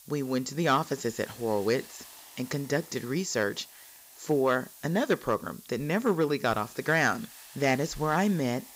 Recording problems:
high frequencies cut off; noticeable; nothing above 8 kHz
hiss; noticeable; throughout; 20 dB below the speech

